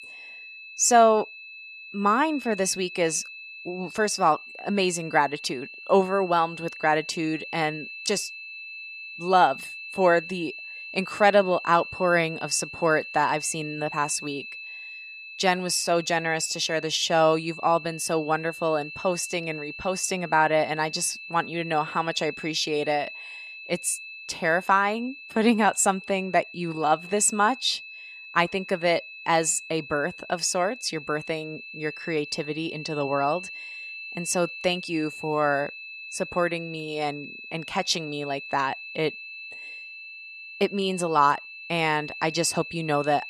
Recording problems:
high-pitched whine; noticeable; throughout; 2.5 kHz, 10 dB below the speech

